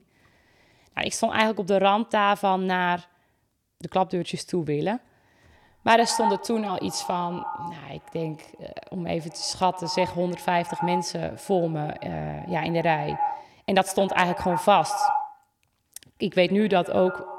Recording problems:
echo of what is said; strong; from 5.5 s on; 110 ms later, 7 dB below the speech

